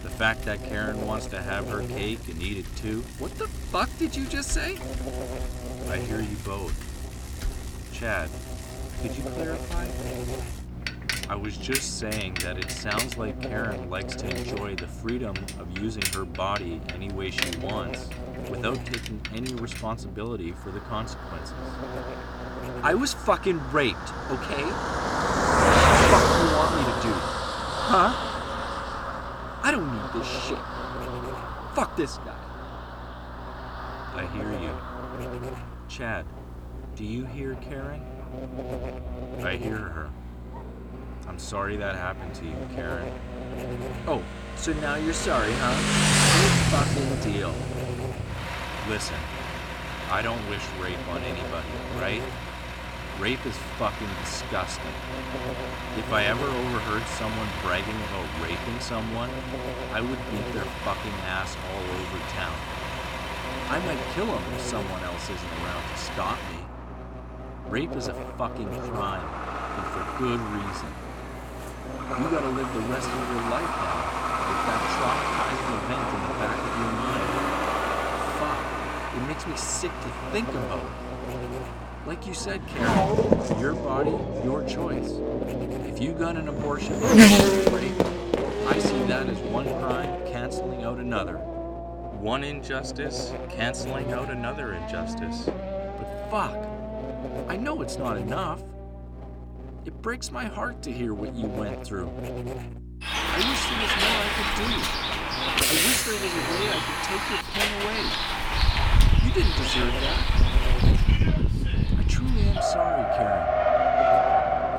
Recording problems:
traffic noise; very loud; throughout; 4 dB above the speech
electrical hum; loud; throughout; 60 Hz, 10 dB below the speech

